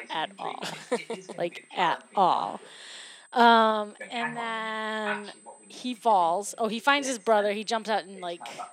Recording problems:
thin; very; fading below 650 Hz
voice in the background; noticeable; throughout; 15 dB below the speech
high-pitched whine; faint; throughout; 8 kHz, 30 dB below the speech

